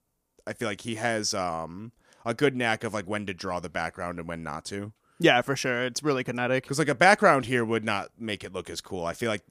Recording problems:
none

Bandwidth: 15 kHz